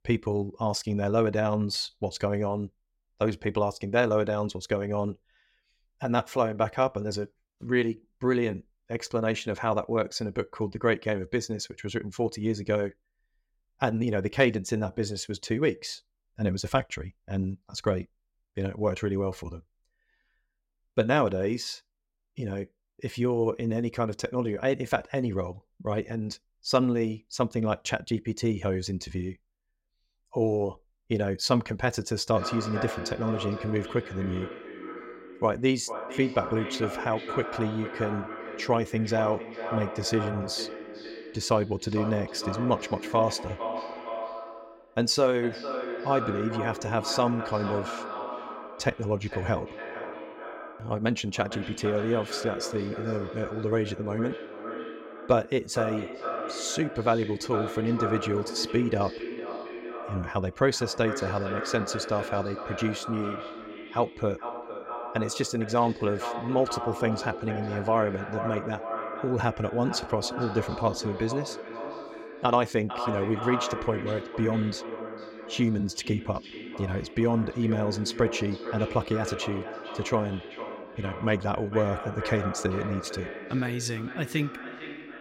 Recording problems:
echo of what is said; strong; from 32 s on; 450 ms later, 8 dB below the speech

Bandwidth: 16 kHz